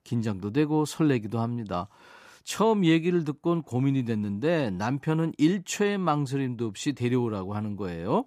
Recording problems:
none

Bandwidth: 14.5 kHz